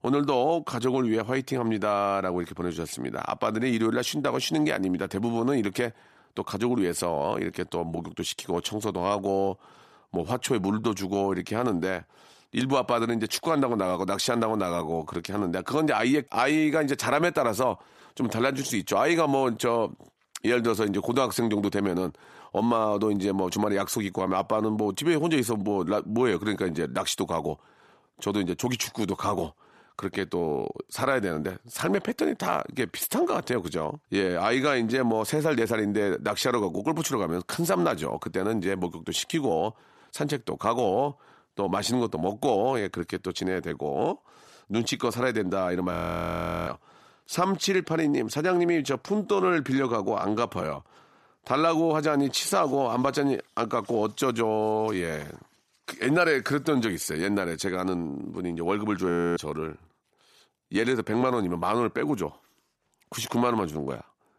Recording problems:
audio freezing; at 46 s for 0.5 s and at 59 s

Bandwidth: 14 kHz